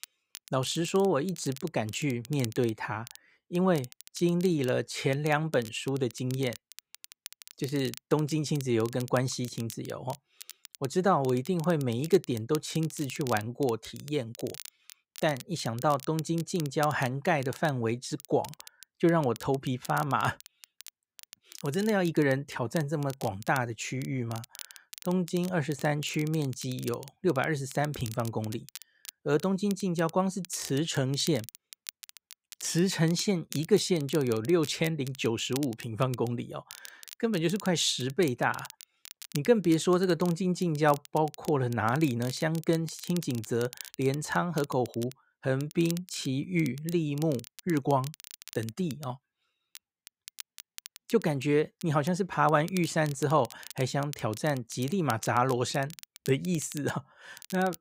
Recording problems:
crackle, like an old record; noticeable; 15 dB below the speech

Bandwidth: 15.5 kHz